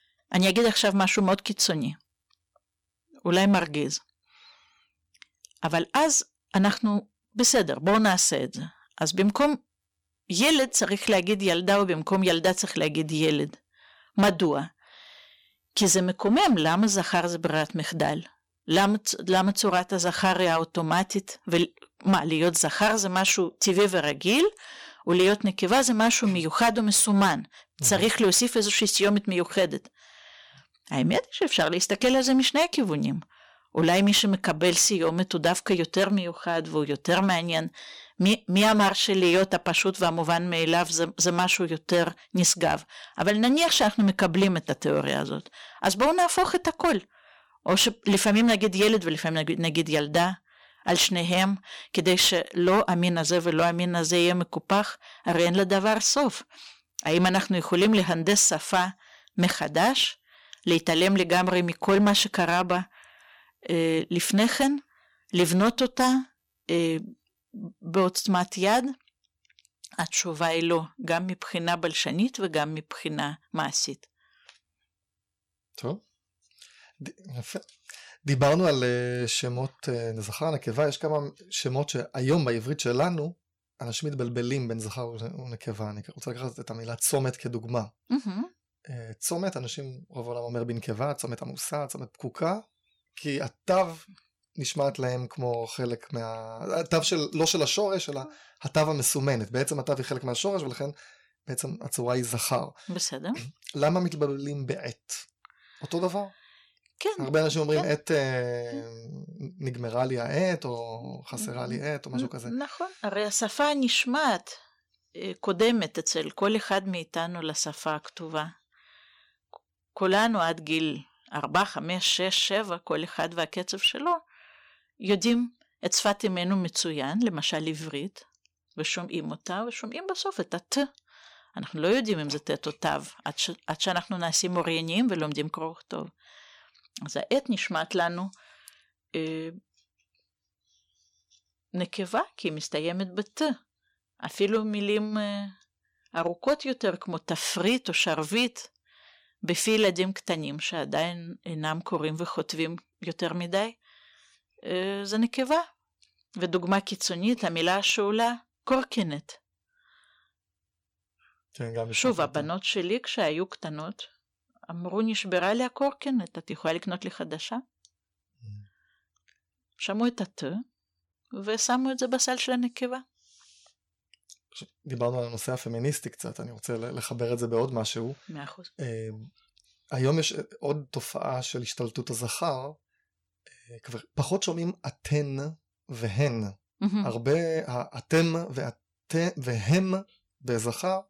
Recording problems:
distortion; slight; 3% of the sound clipped

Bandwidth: 17.5 kHz